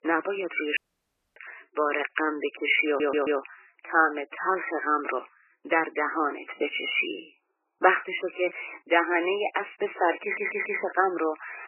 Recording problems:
garbled, watery; badly; nothing above 3 kHz
thin; very; fading below 350 Hz
audio cutting out; at 1 s for 0.5 s
audio stuttering; at 3 s and at 10 s

